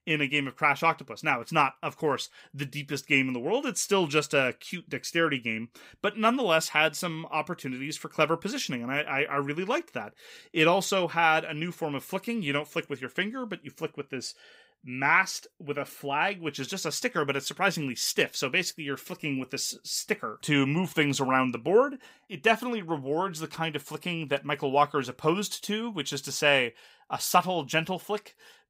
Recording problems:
none

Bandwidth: 15.5 kHz